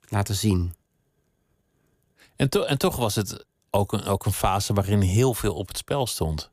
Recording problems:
none

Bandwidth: 15 kHz